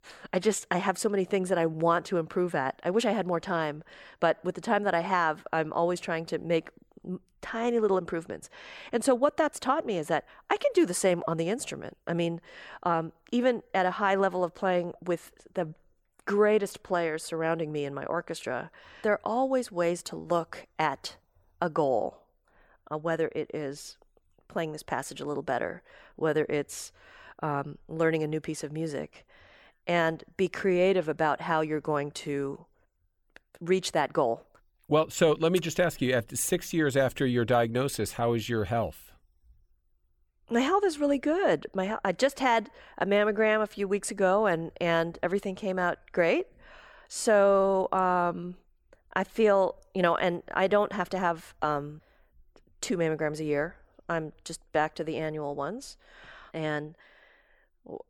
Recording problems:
none

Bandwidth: 18 kHz